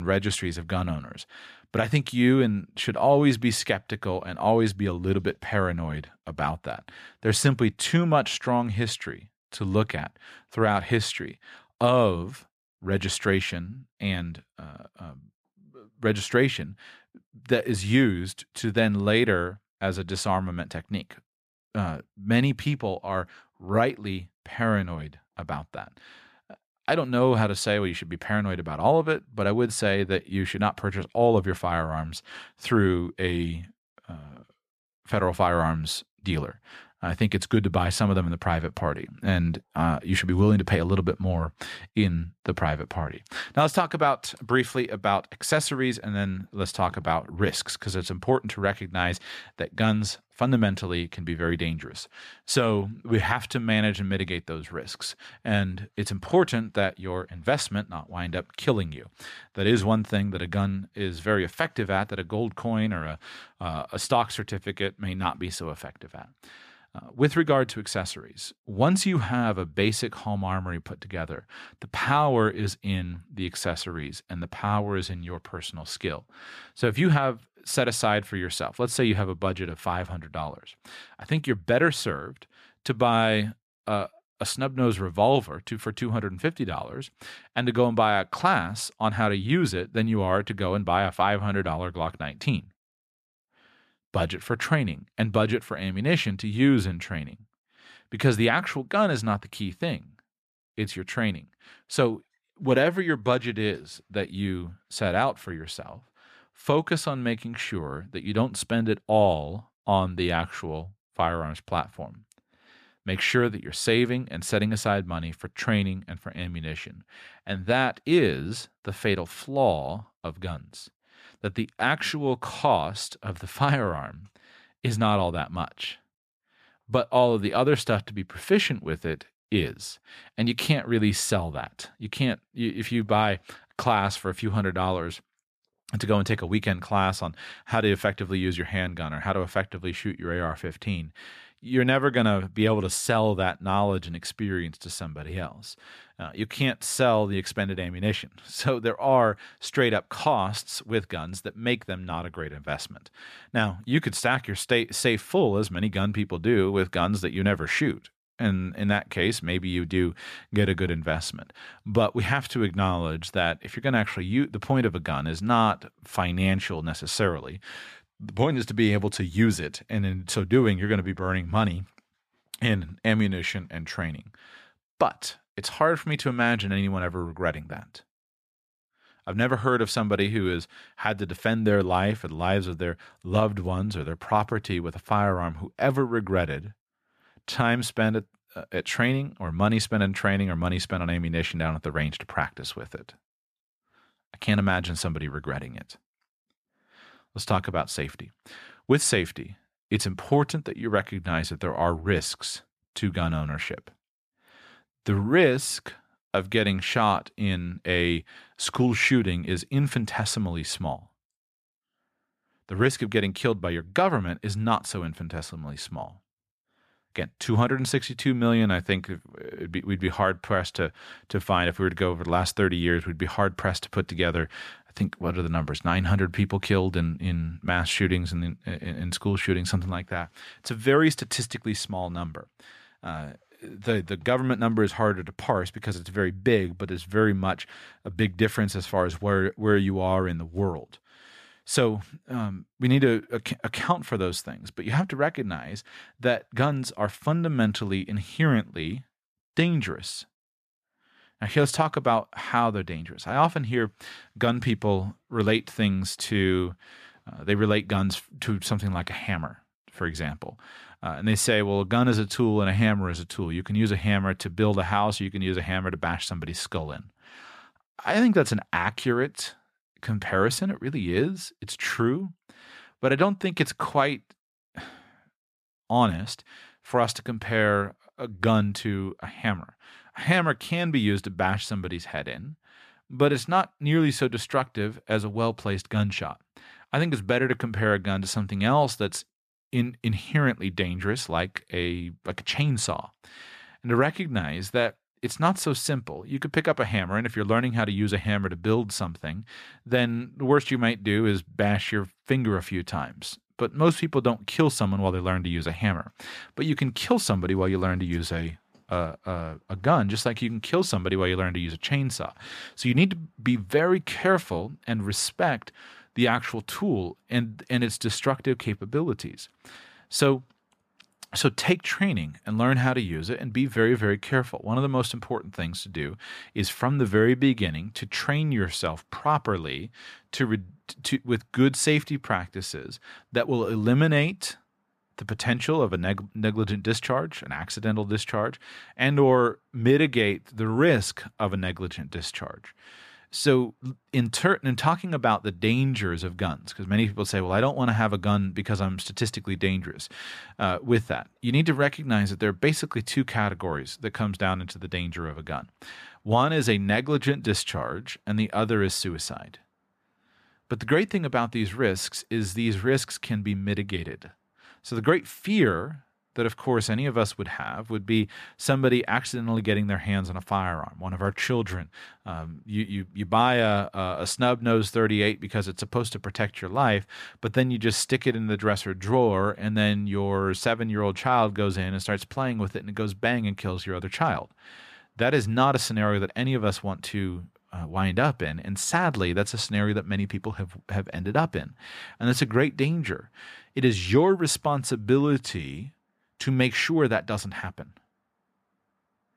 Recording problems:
abrupt cut into speech; at the start

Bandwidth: 14.5 kHz